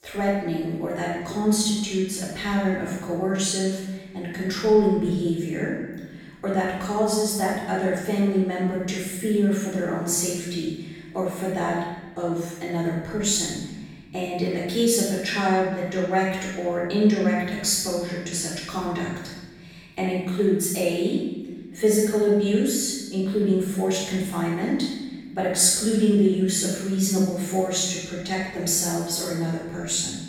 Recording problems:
room echo; strong; dies away in 1.3 s
off-mic speech; far

